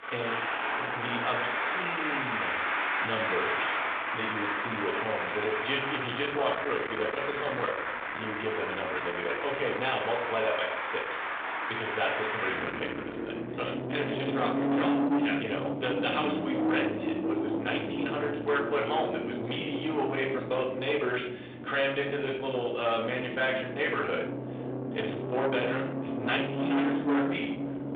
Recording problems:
distortion; heavy; 10 dB below the speech
off-mic speech; far
room echo; slight; dies away in 0.5 s
phone-call audio
traffic noise; loud; throughout; as loud as the speech

